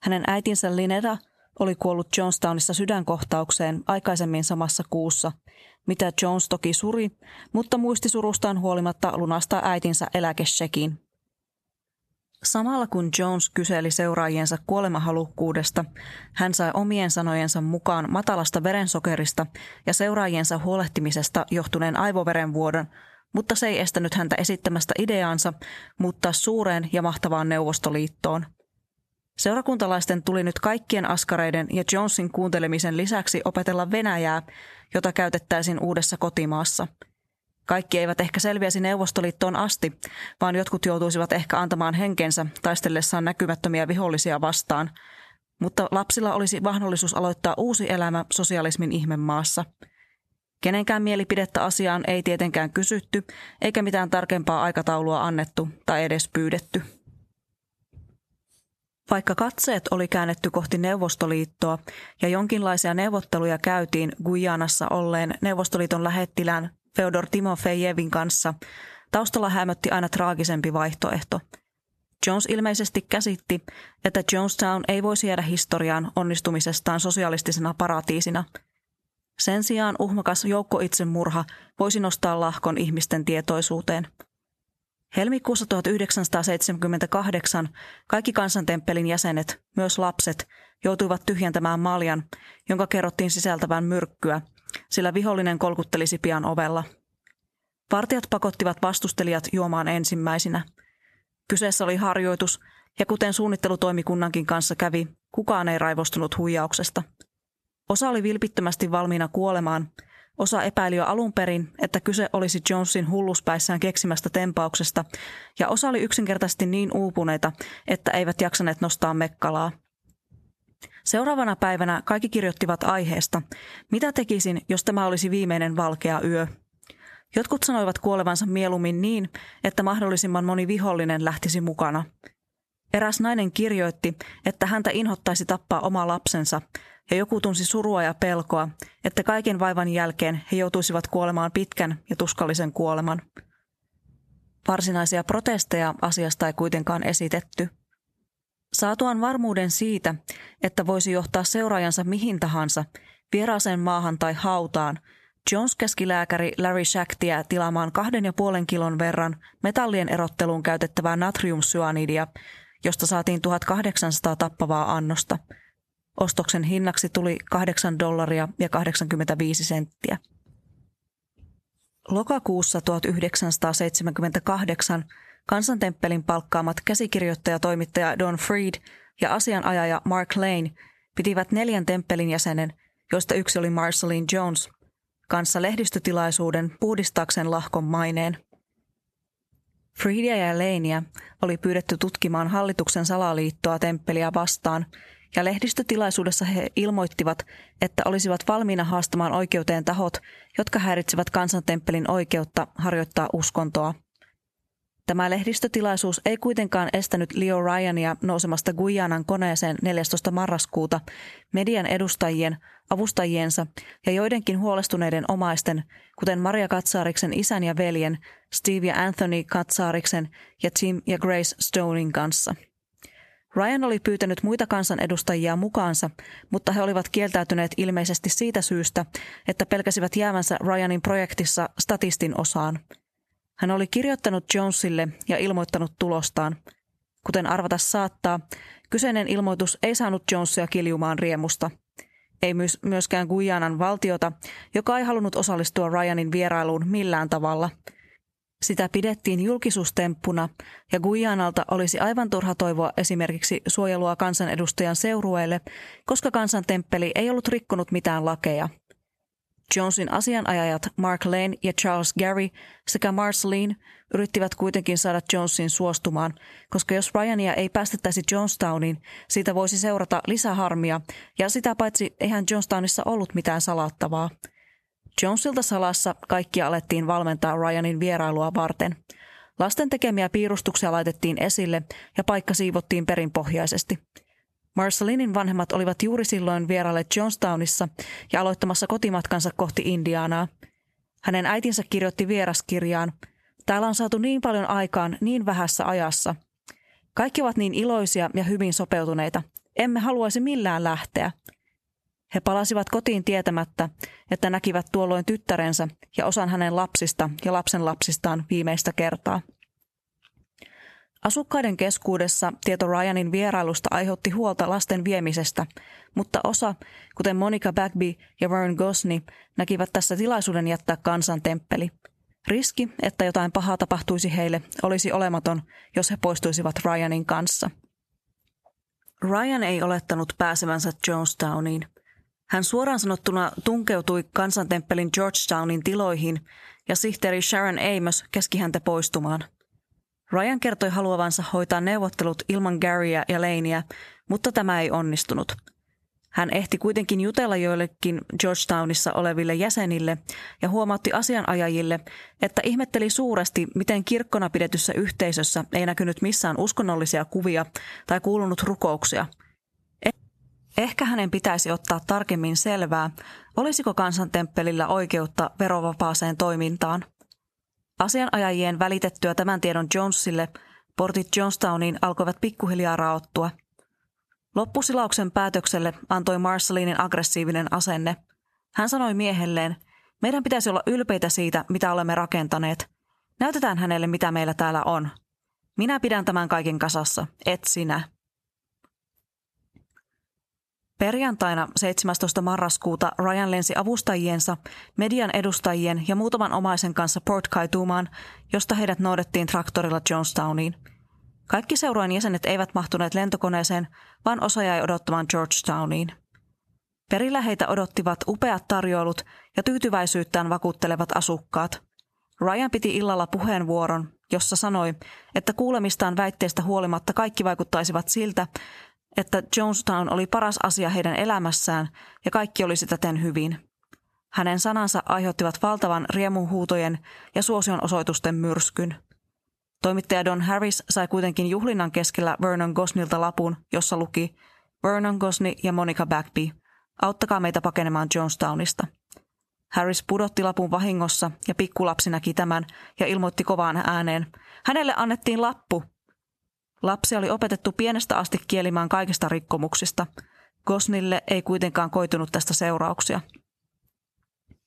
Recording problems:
squashed, flat; somewhat

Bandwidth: 13.5 kHz